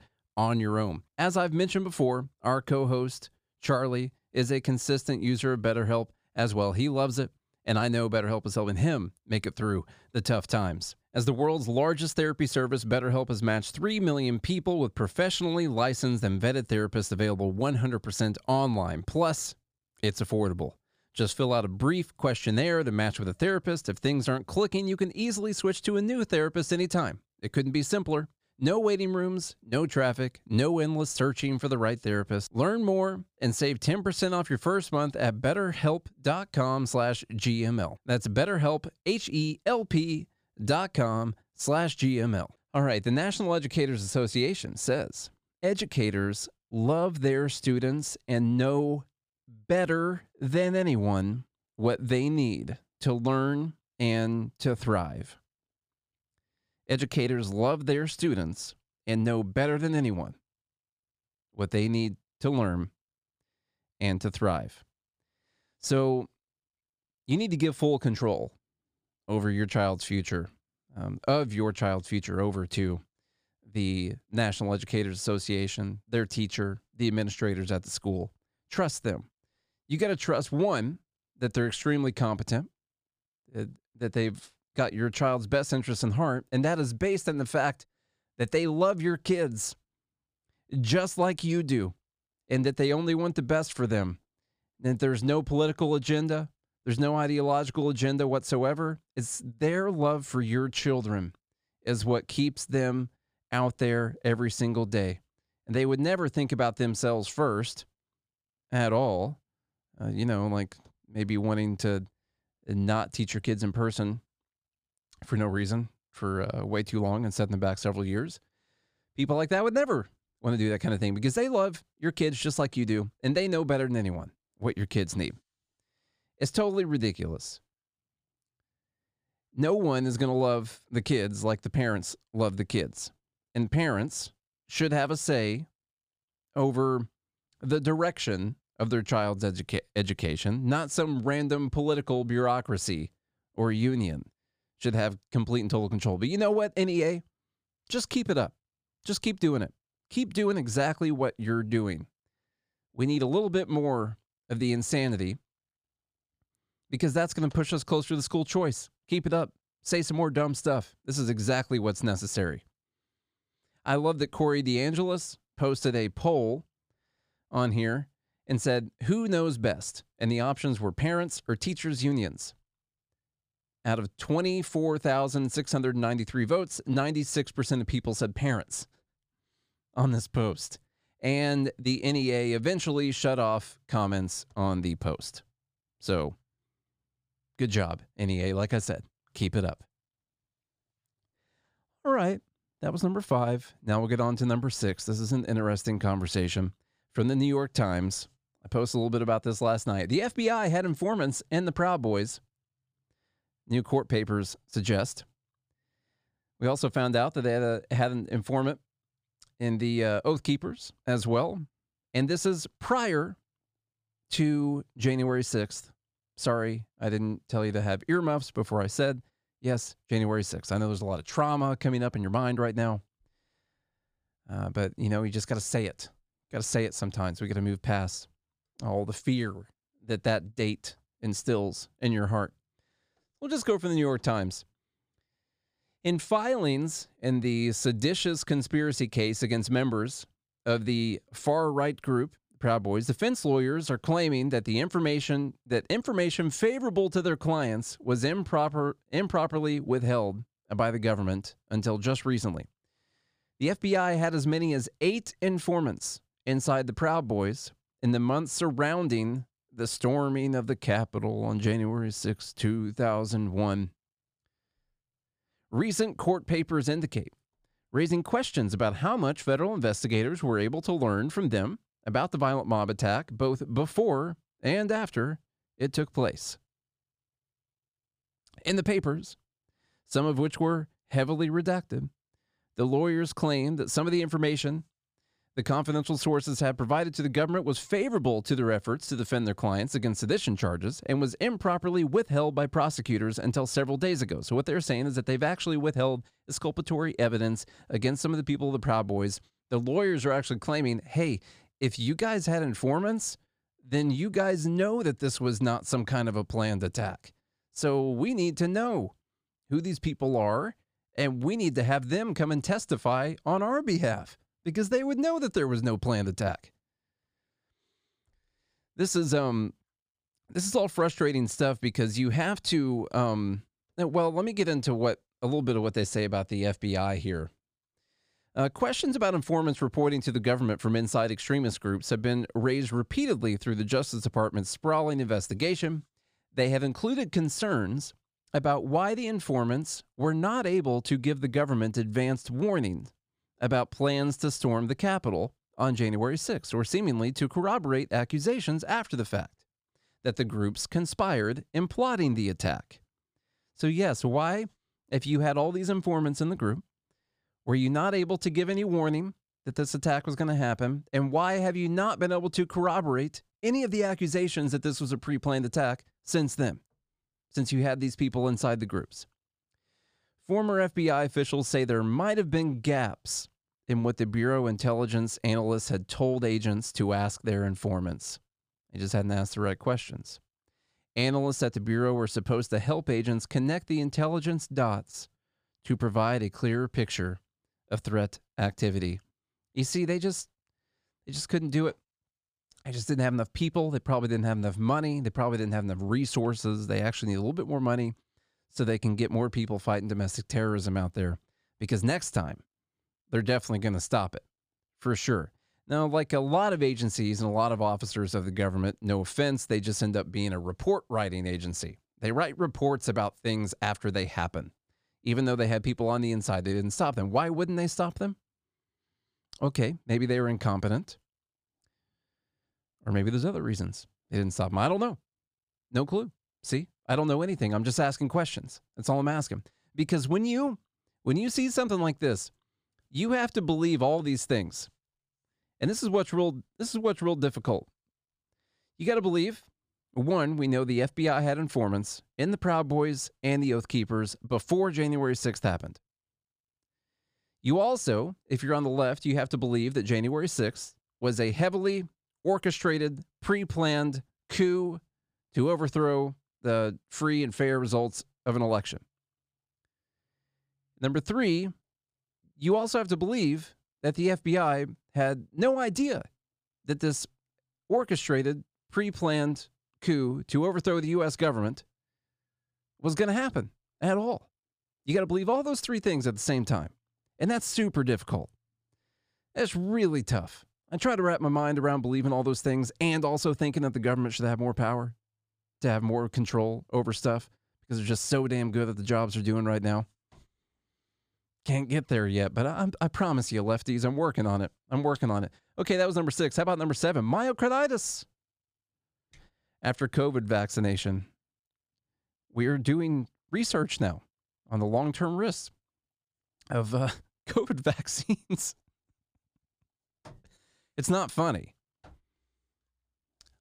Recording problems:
none

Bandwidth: 15 kHz